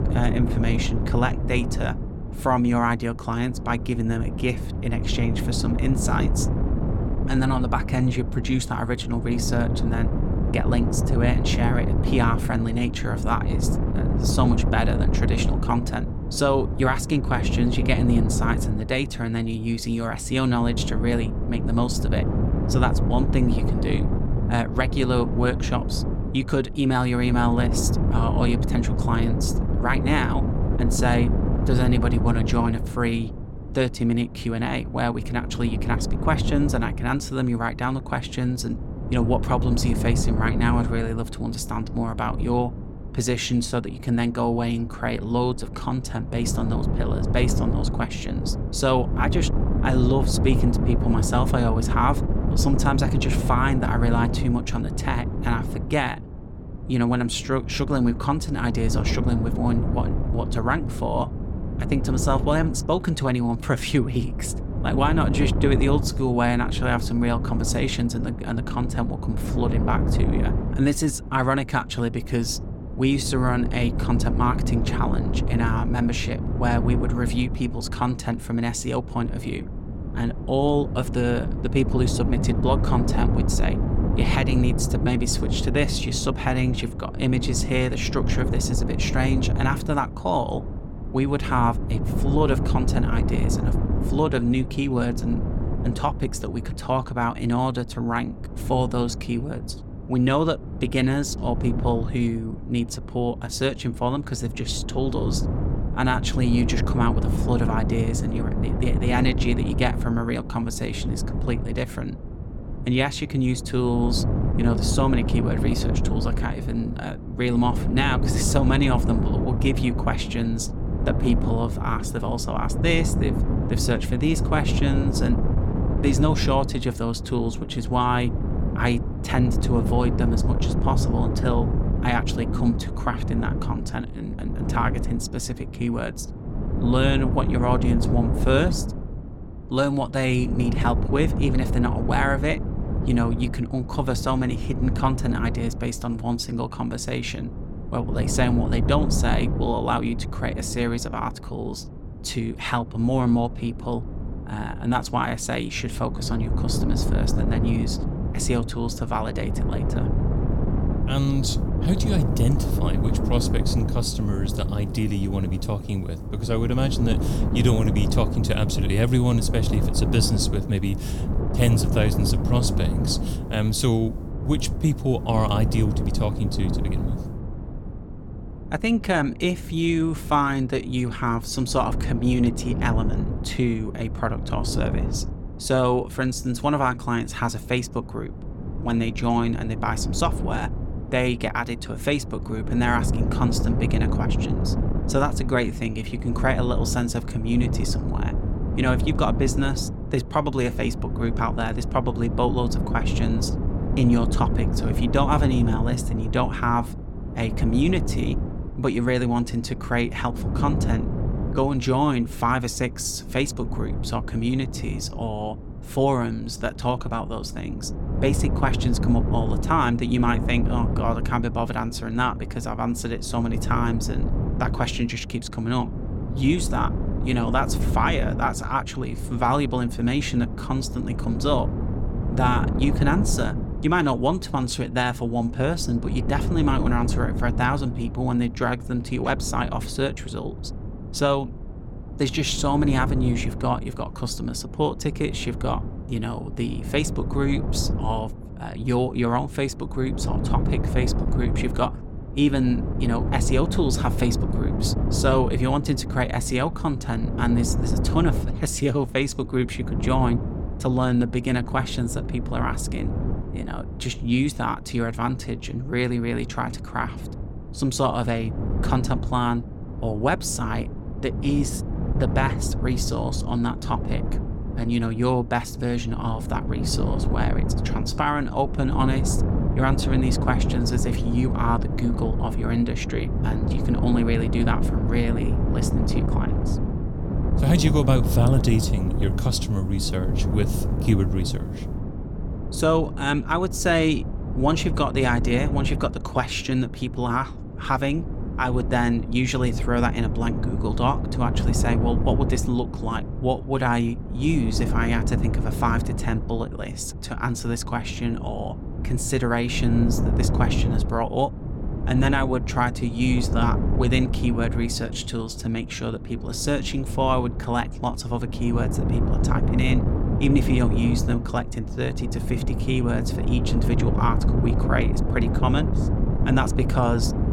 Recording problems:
wind noise on the microphone; heavy; 8 dB below the speech

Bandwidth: 17.5 kHz